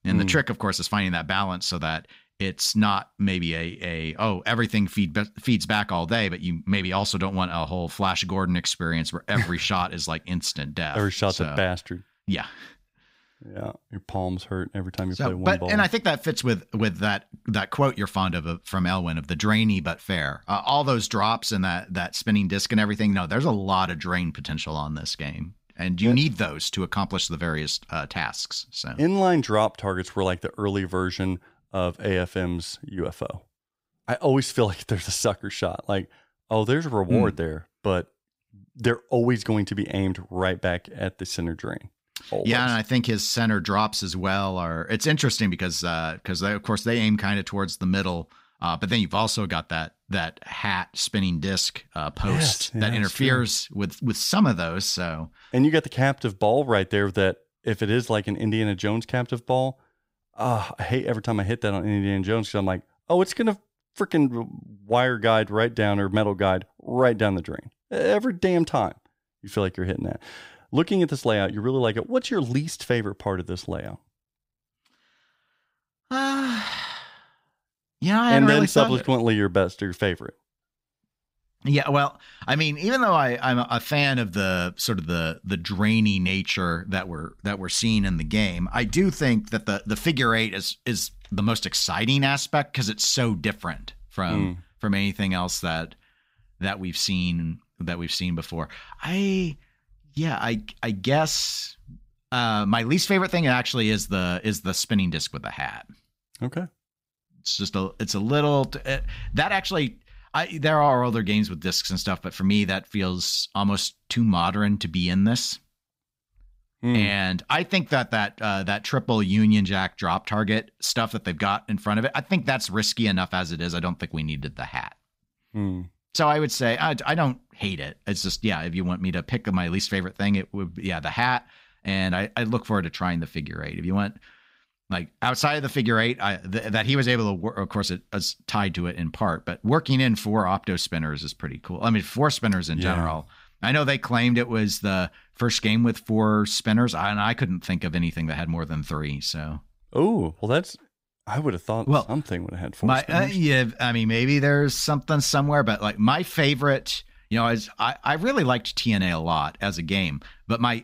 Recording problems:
none

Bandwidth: 15.5 kHz